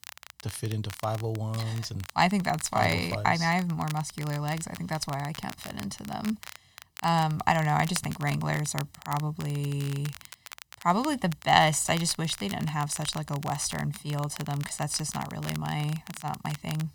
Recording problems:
crackle, like an old record; noticeable; 15 dB below the speech

